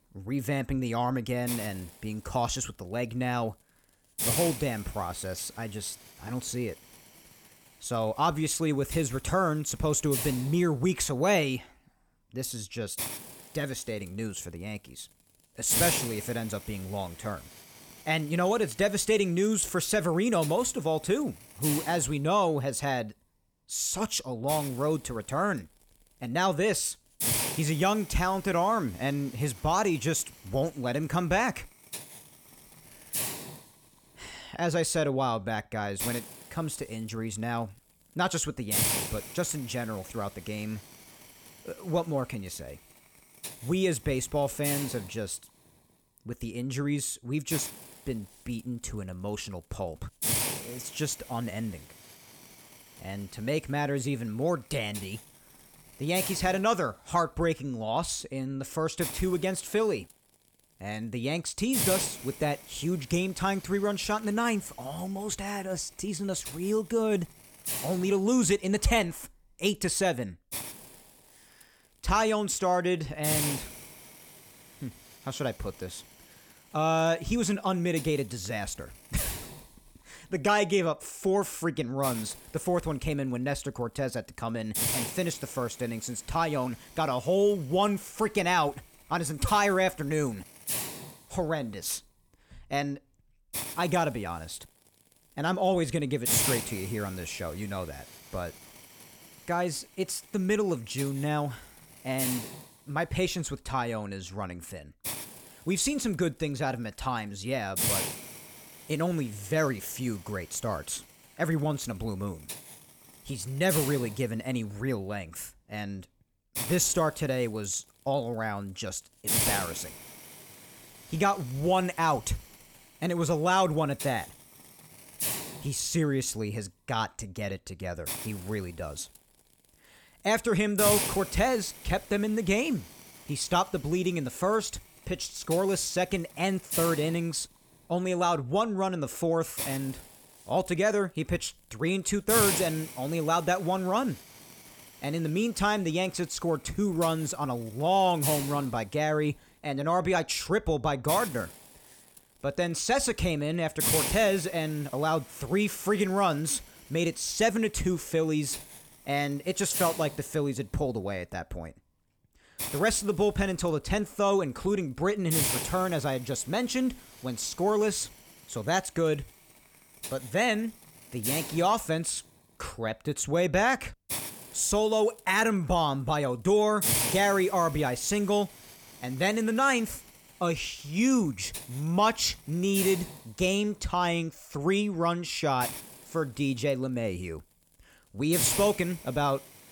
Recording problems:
hiss; loud; throughout; 3 dB below the speech

